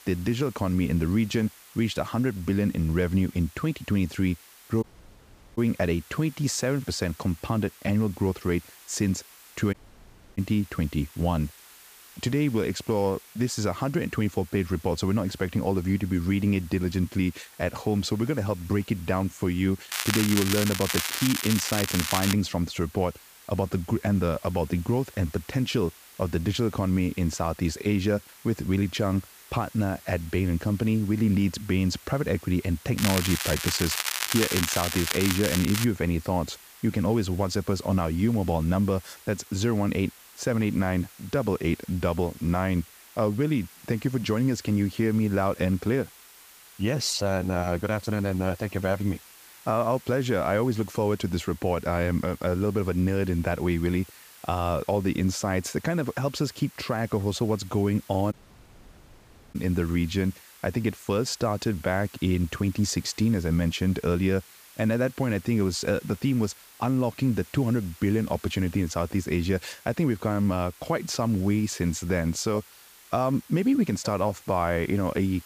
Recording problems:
crackling; loud; from 20 to 22 s and from 33 to 36 s; 1 dB below the speech
hiss; faint; throughout; 20 dB below the speech
audio cutting out; at 5 s for 0.5 s, at 9.5 s for 0.5 s and at 58 s for 1 s

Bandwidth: 15 kHz